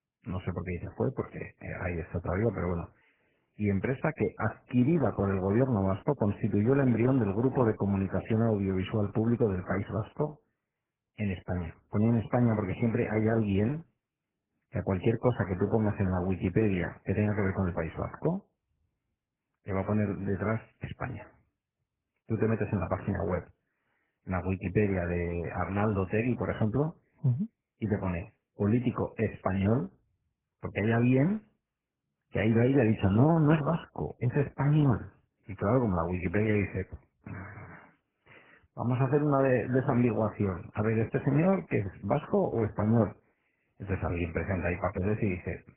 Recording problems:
garbled, watery; badly

